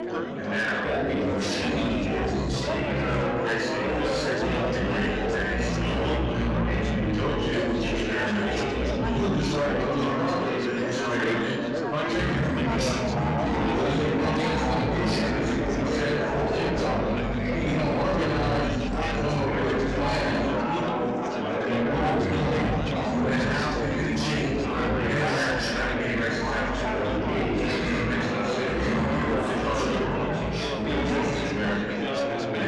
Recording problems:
room echo; strong; dies away in 1.2 s
off-mic speech; far
wrong speed and pitch; too slow and too low; 0.6 times normal speed
distortion; slight; 10 dB below the speech
chatter from many people; very loud; throughout; 3 dB above the speech

